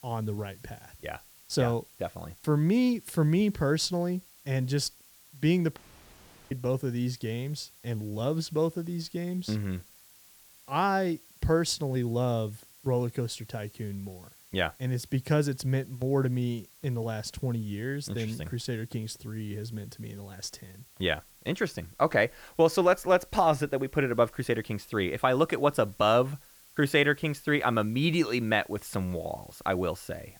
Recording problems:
hiss; faint; throughout; 25 dB below the speech
audio cutting out; at 6 s for 0.5 s

